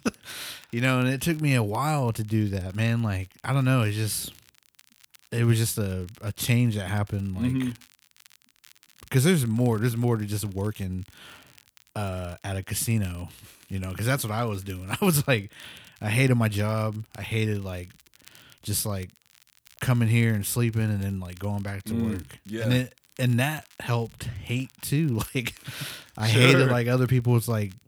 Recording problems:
crackle, like an old record; faint; 30 dB below the speech

